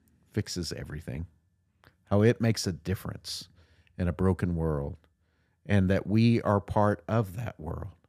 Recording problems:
none

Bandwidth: 15 kHz